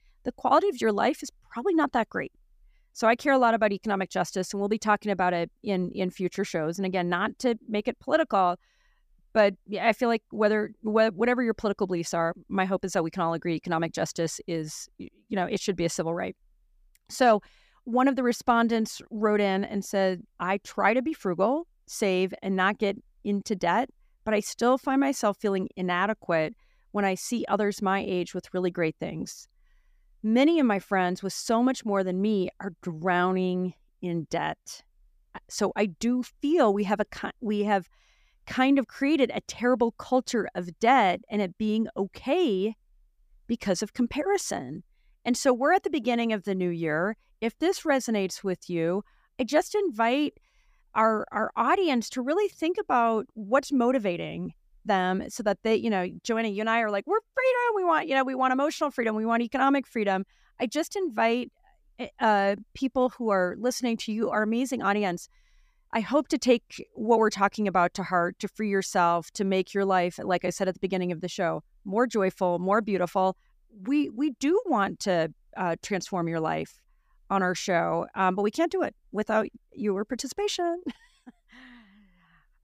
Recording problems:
none

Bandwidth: 15 kHz